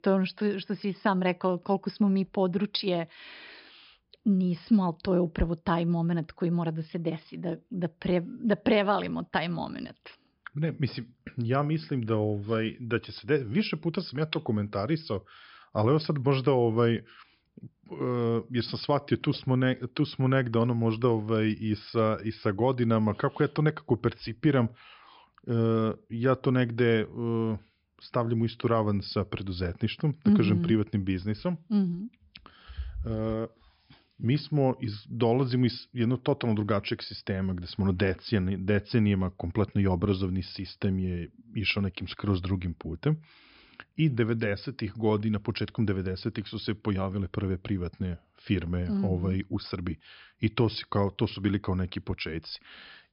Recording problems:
high frequencies cut off; noticeable; nothing above 5.5 kHz

